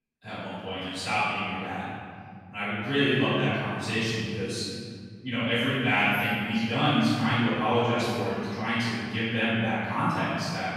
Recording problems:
room echo; strong; dies away in 2.4 s
off-mic speech; far

